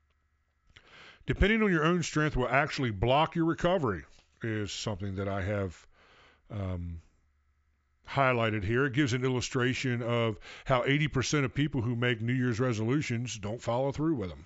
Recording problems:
high frequencies cut off; noticeable; nothing above 8 kHz

